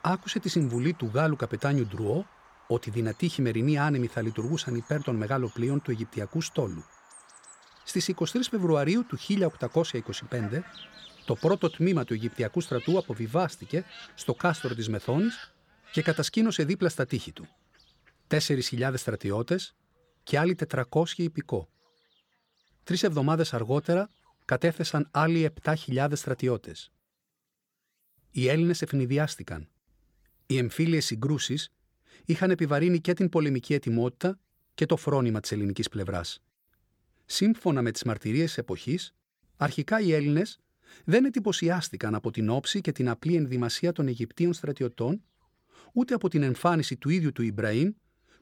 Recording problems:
animal sounds; faint; throughout; 20 dB below the speech

